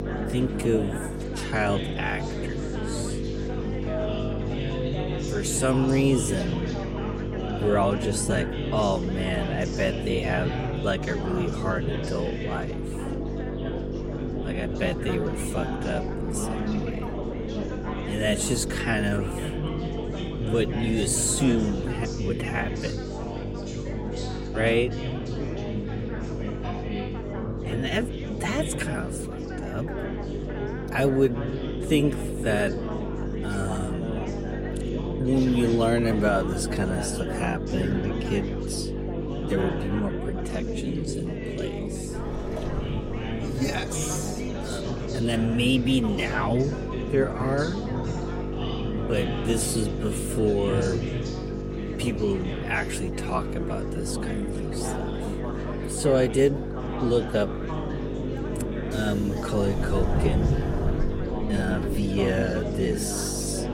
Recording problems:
wrong speed, natural pitch; too slow; 0.6 times normal speed
electrical hum; loud; throughout; 50 Hz, 8 dB below the speech
chatter from many people; loud; throughout; 7 dB below the speech
train or aircraft noise; noticeable; throughout; 15 dB below the speech

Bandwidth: 16 kHz